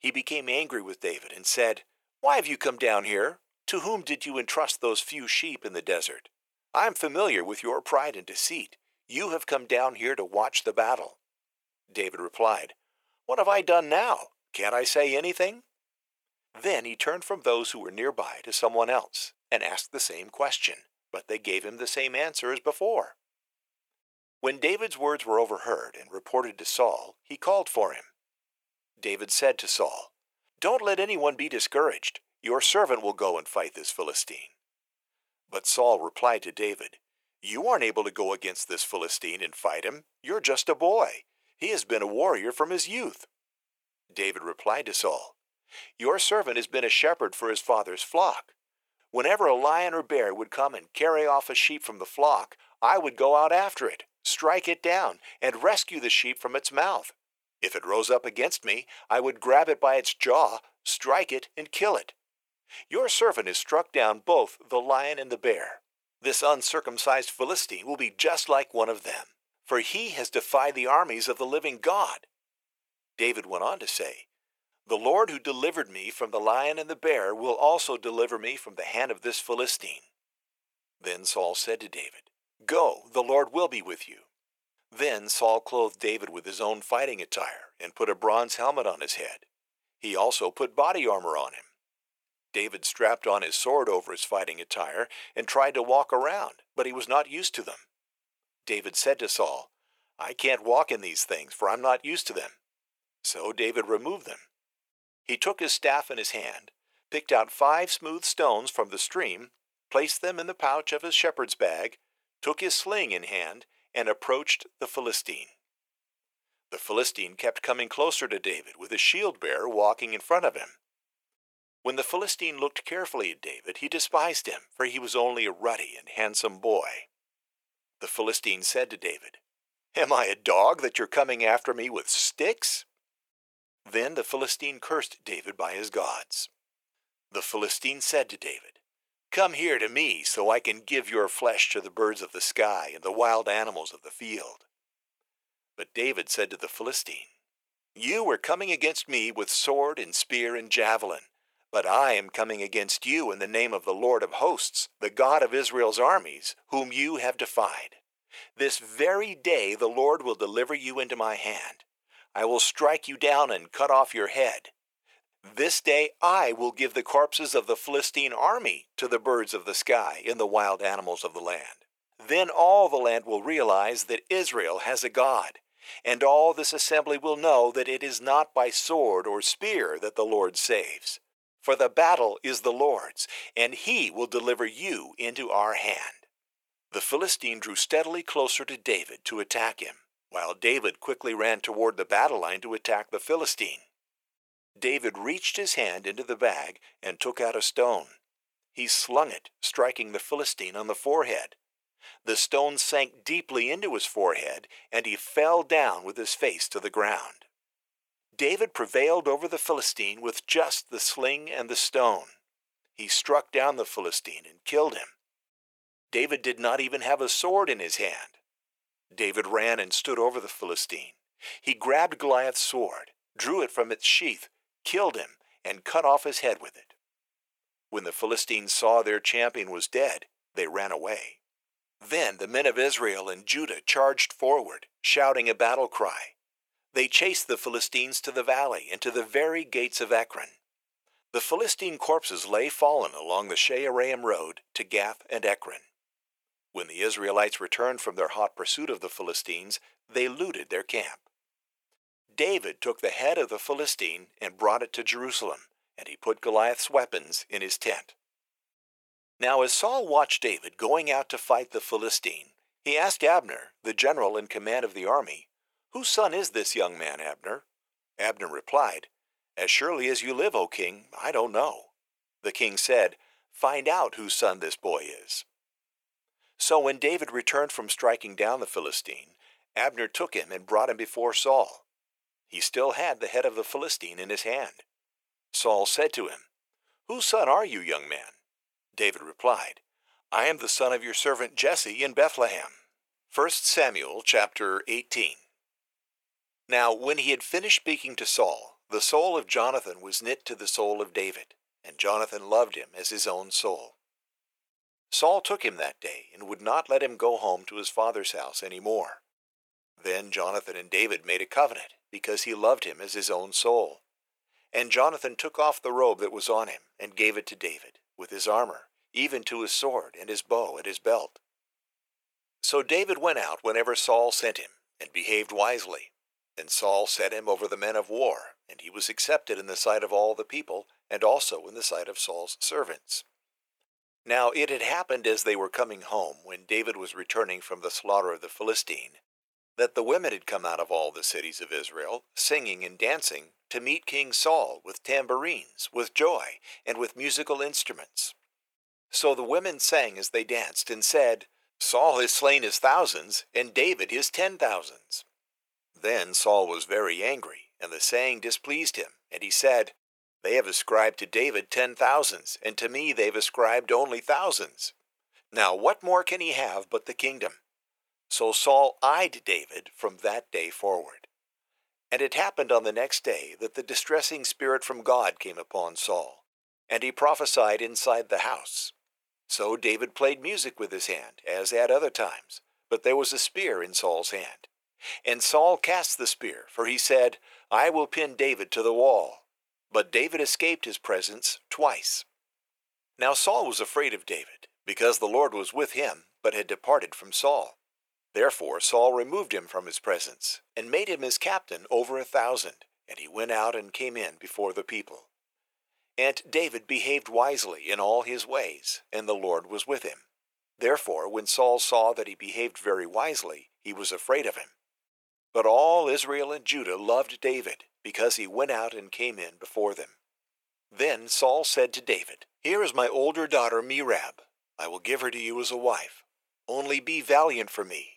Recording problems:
thin; very; fading below 550 Hz

